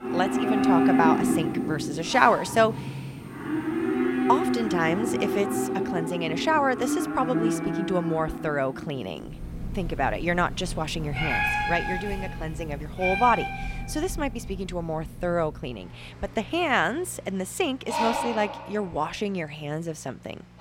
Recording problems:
animal sounds; loud; throughout; 1 dB below the speech

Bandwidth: 16 kHz